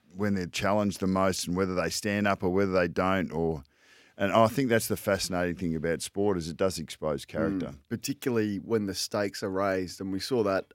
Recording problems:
none

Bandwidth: 16 kHz